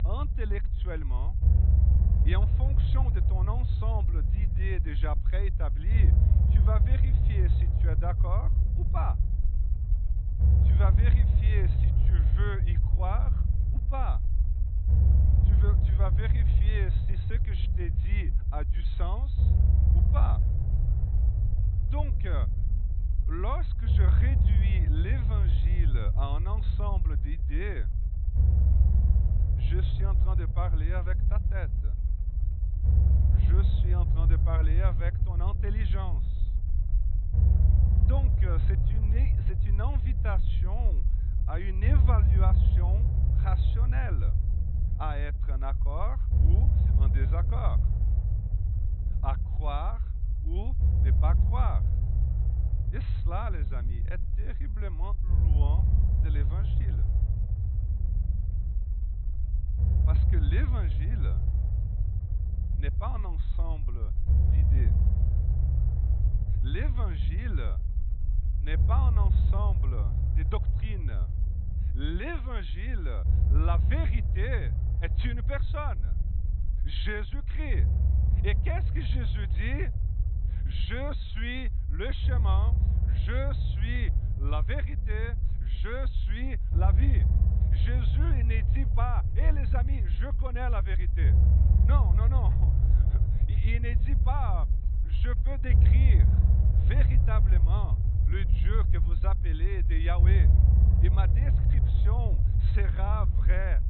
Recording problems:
high frequencies cut off; severe; nothing above 4 kHz
low rumble; loud; throughout; 4 dB below the speech

